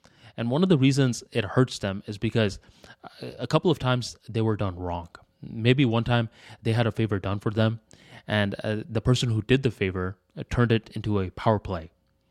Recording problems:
none

